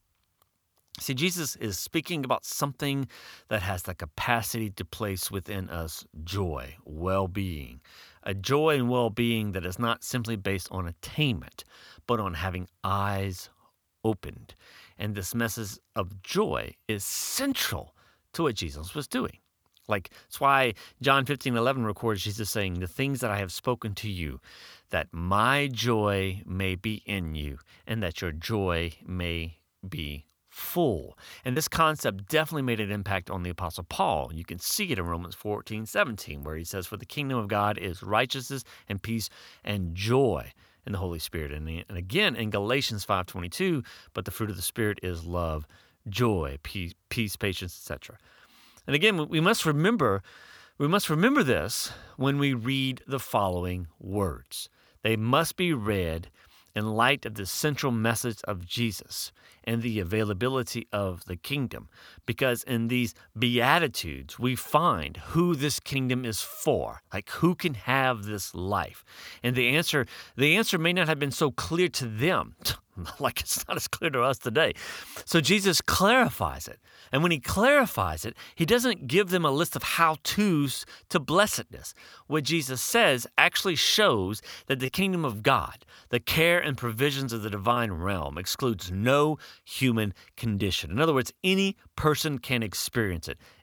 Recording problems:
choppy; occasionally; at 32 s; 1% of the speech affected

